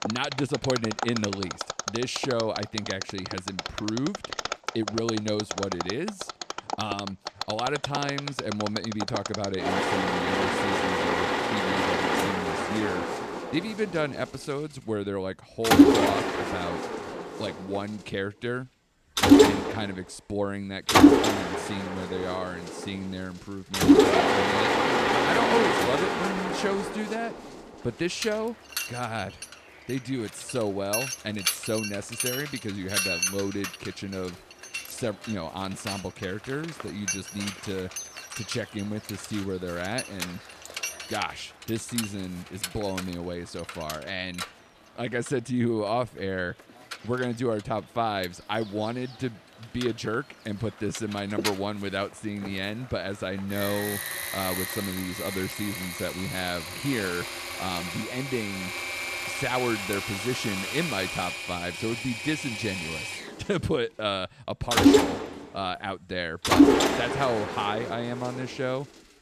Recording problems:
machinery noise; very loud; throughout; 5 dB above the speech

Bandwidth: 14.5 kHz